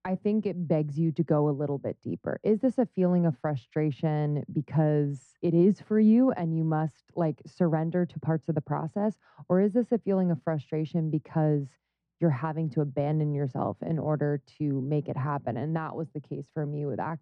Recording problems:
muffled; very; fading above 1.5 kHz

